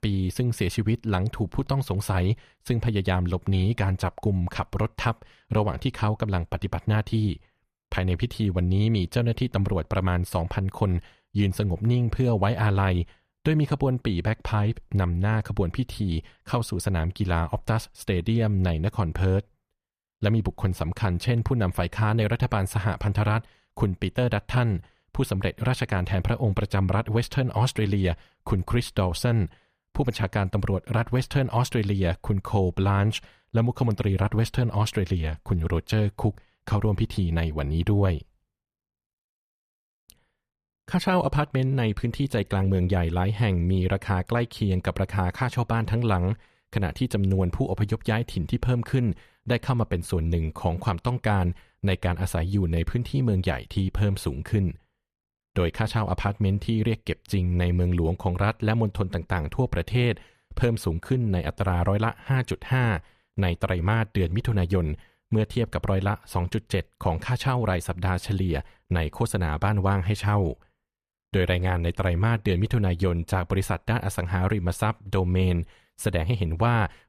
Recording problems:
none

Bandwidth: 15 kHz